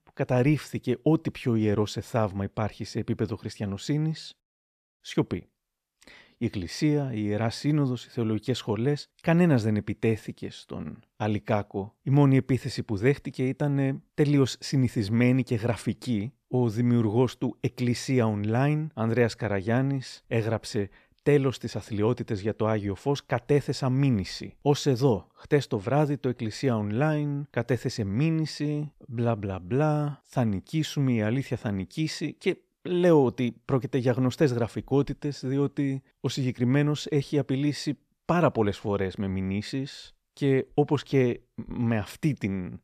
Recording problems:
none

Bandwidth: 14.5 kHz